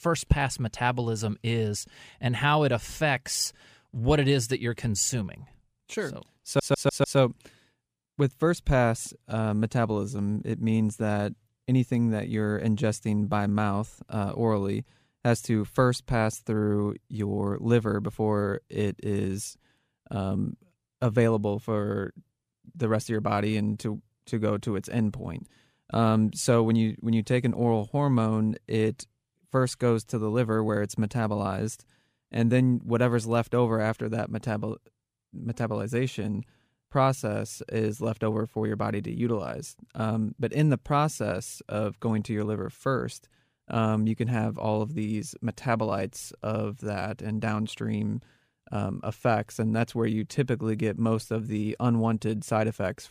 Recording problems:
audio stuttering; at 6.5 s

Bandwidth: 15 kHz